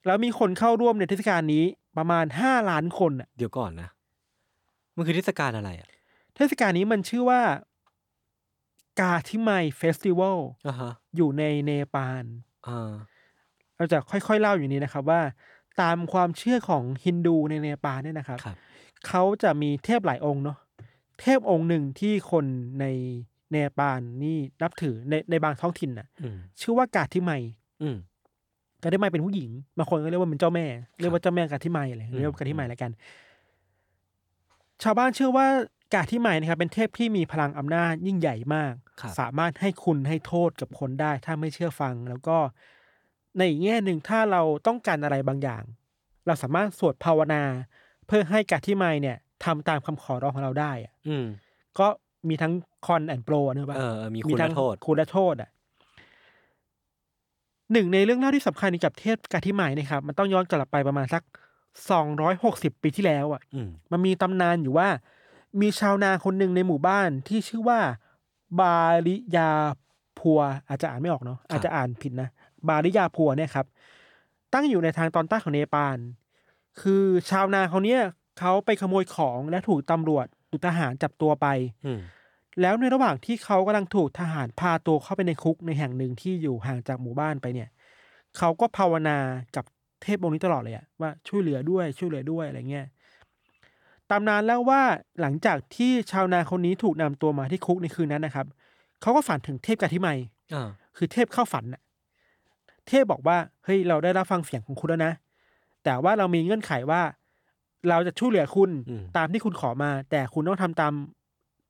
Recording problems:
none

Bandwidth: 18.5 kHz